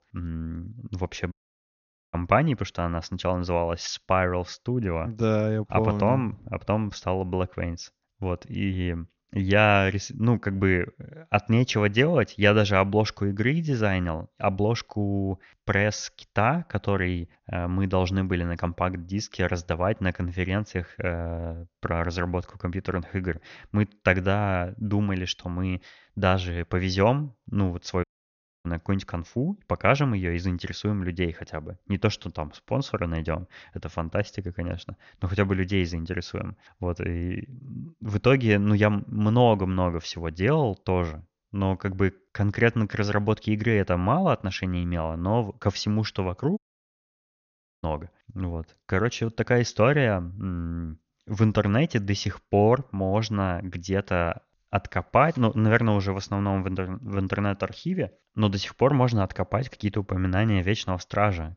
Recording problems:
high frequencies cut off; noticeable; nothing above 6.5 kHz
audio cutting out; at 1.5 s for 1 s, at 28 s for 0.5 s and at 47 s for 1.5 s

